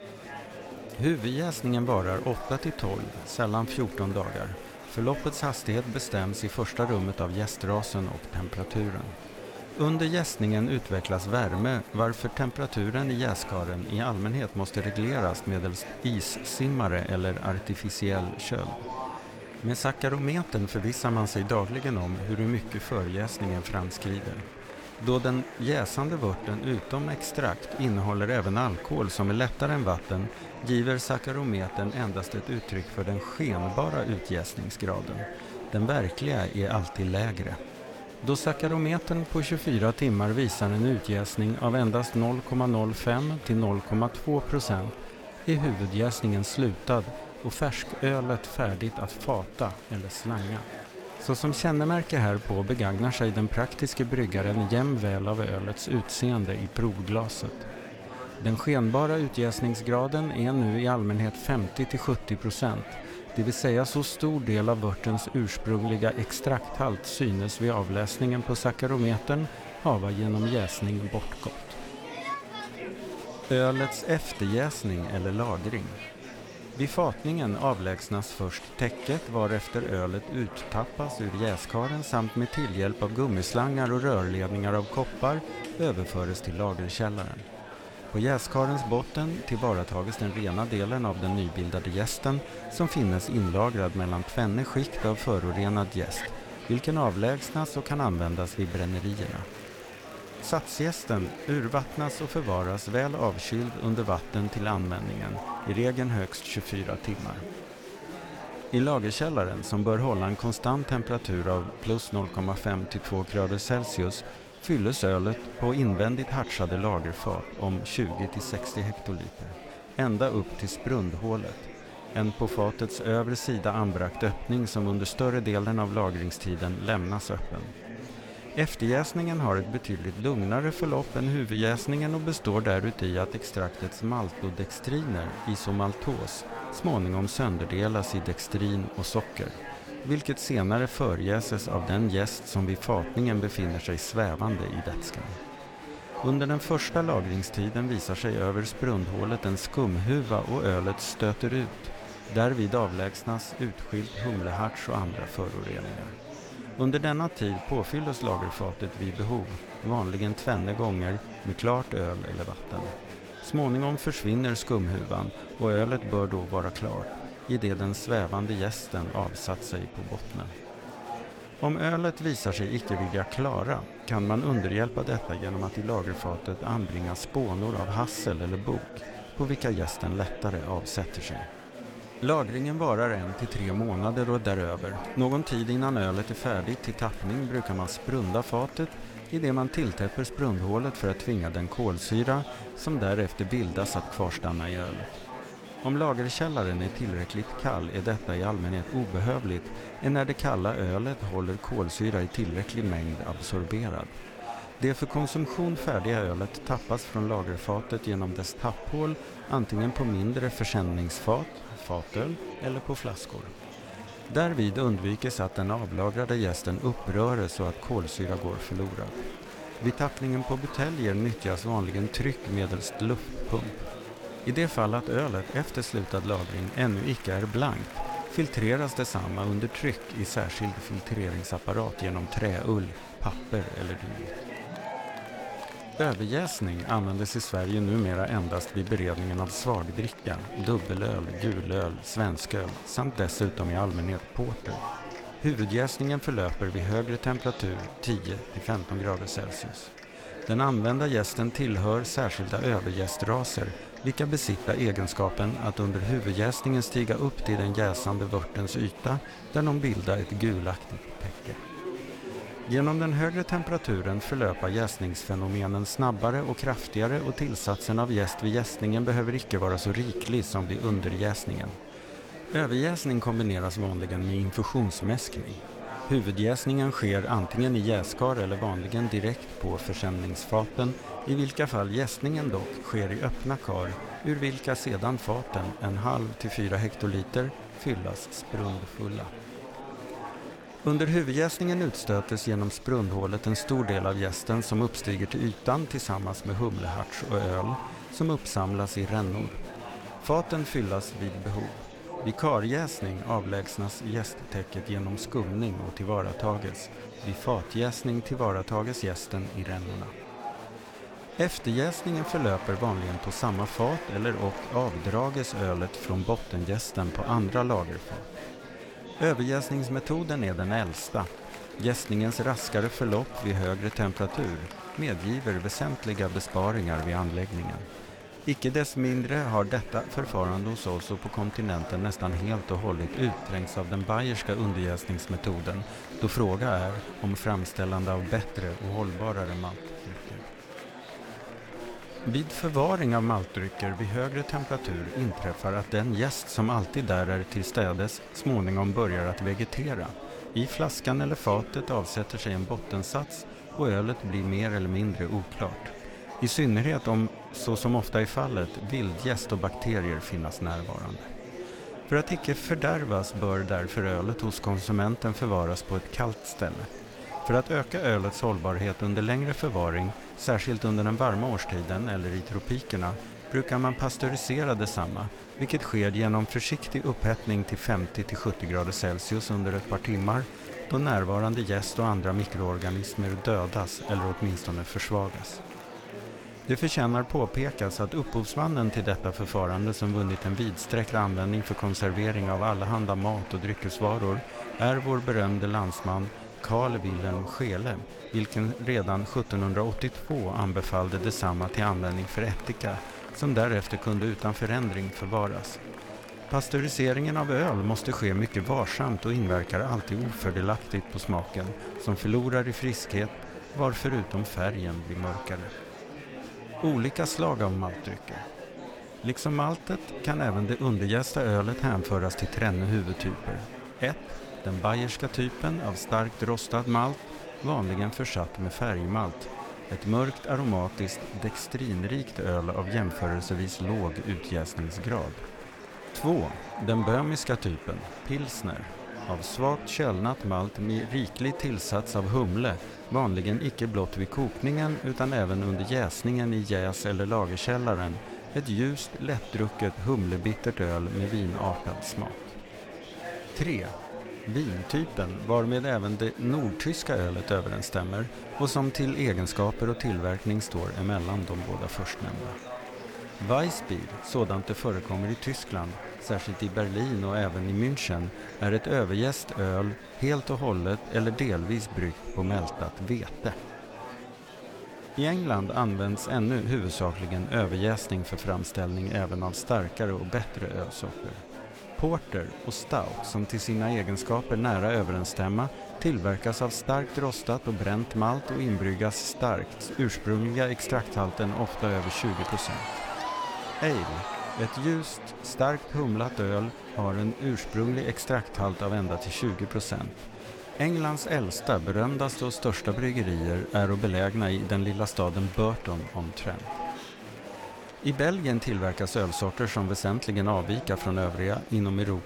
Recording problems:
murmuring crowd; noticeable; throughout; 10 dB below the speech

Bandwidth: 18 kHz